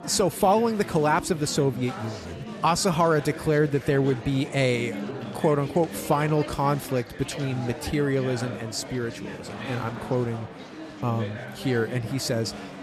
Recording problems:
chatter from many people; noticeable; throughout; 10 dB below the speech

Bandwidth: 13.5 kHz